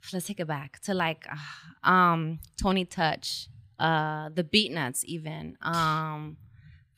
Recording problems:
none

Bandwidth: 15 kHz